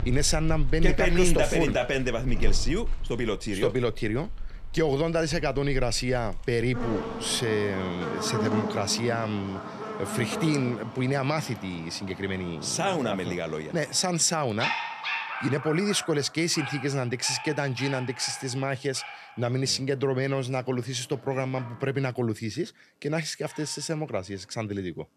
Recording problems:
animal sounds; loud; throughout; 8 dB below the speech

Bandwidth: 13.5 kHz